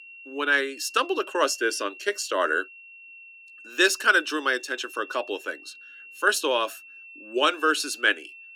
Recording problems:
thin; somewhat; fading below 300 Hz
high-pitched whine; noticeable; throughout; 2.5 kHz, 20 dB below the speech

